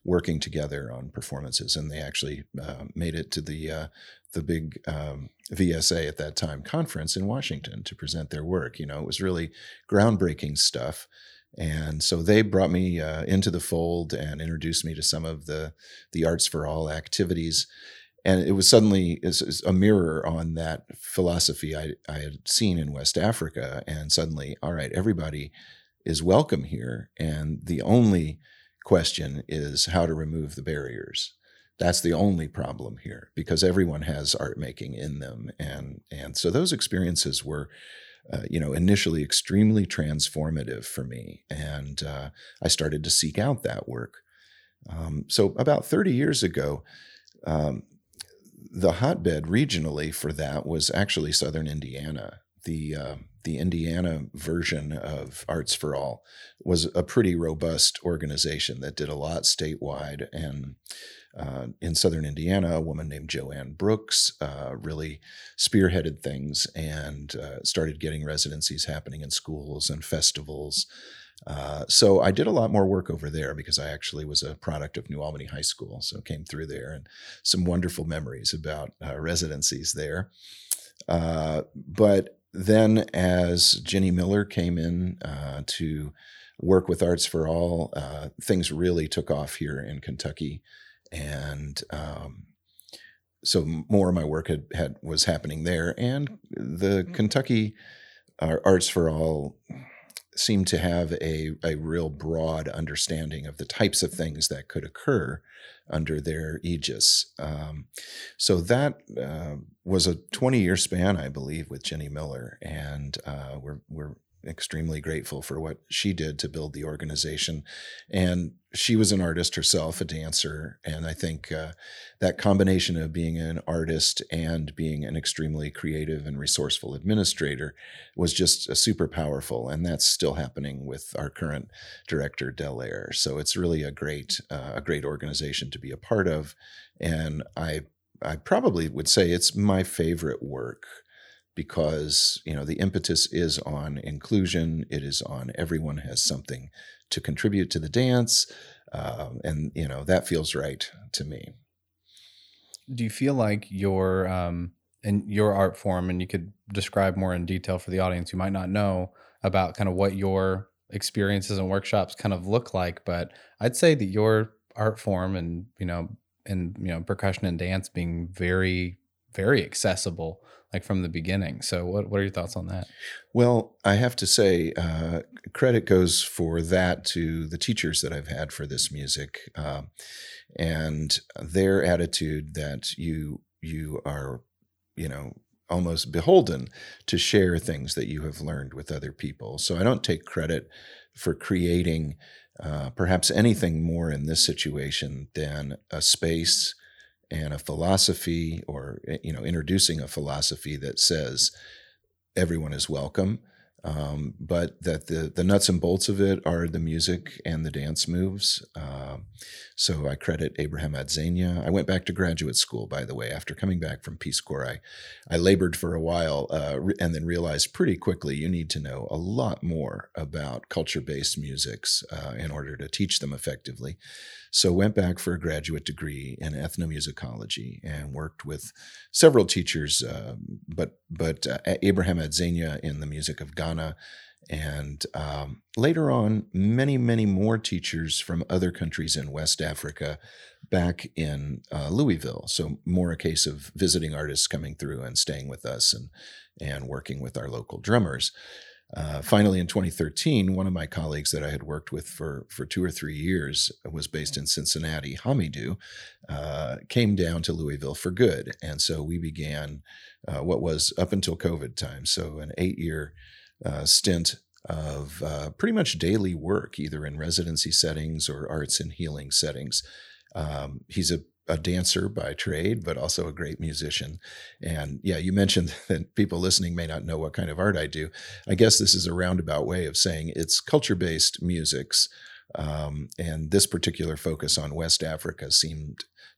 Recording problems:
none

